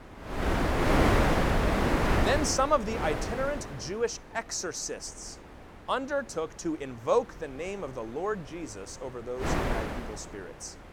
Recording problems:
wind noise on the microphone; heavy; 2 dB above the speech

